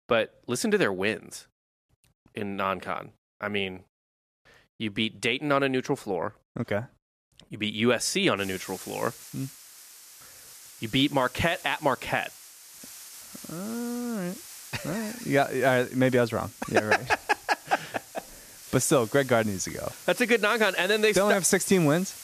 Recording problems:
hiss; noticeable; from 8.5 s on; 15 dB below the speech

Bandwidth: 14.5 kHz